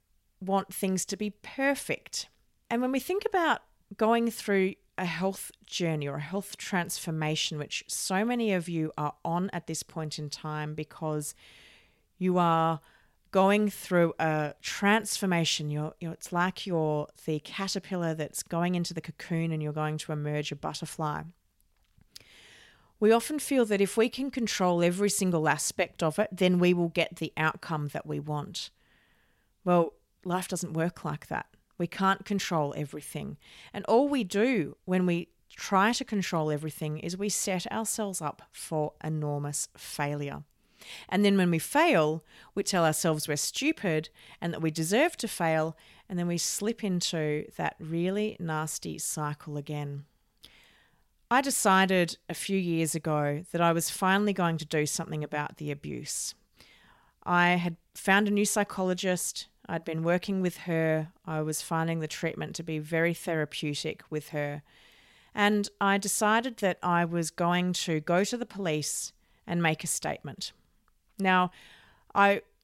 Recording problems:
none

